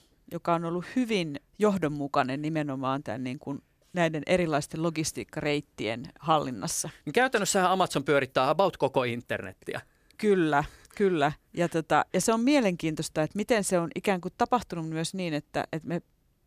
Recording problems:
none

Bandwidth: 15 kHz